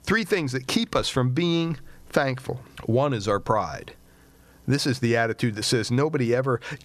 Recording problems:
squashed, flat; somewhat

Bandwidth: 14.5 kHz